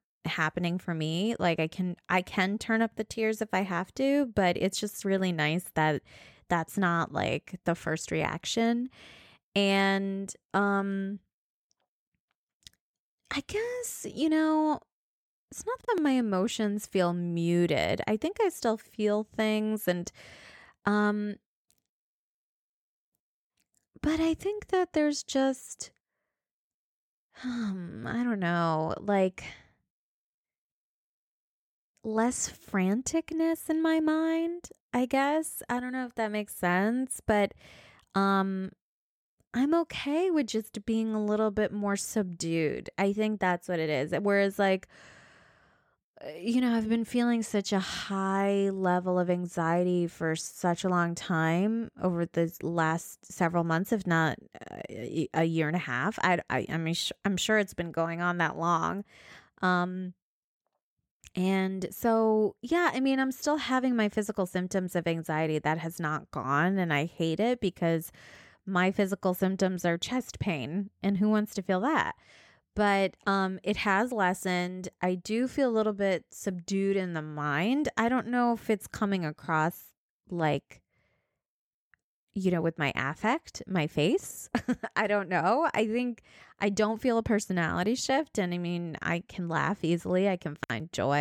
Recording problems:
abrupt cut into speech; at the end

